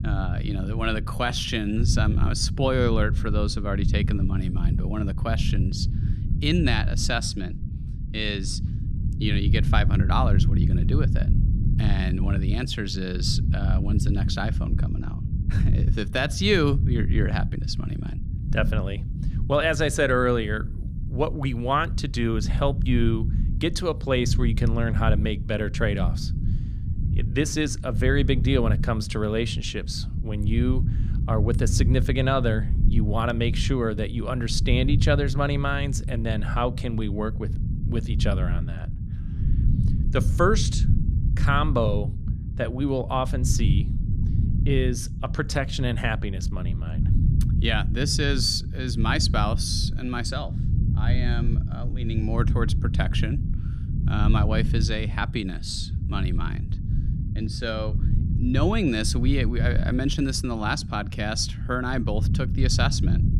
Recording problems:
low rumble; noticeable; throughout; 10 dB below the speech

